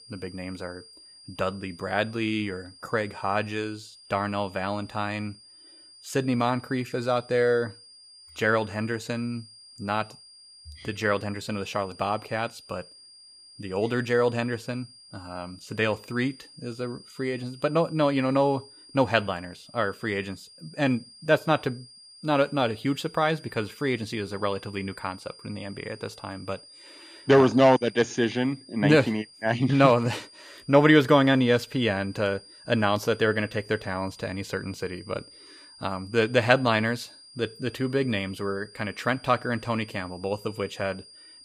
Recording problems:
high-pitched whine; faint; throughout; 5 kHz, 20 dB below the speech

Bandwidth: 15 kHz